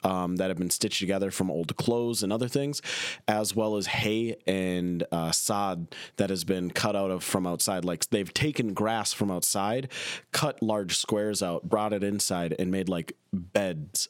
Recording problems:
squashed, flat; somewhat

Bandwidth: 16.5 kHz